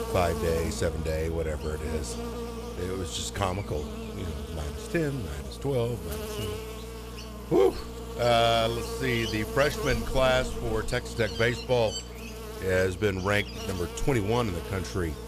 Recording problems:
electrical hum; loud; throughout; 60 Hz, 10 dB below the speech

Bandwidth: 14.5 kHz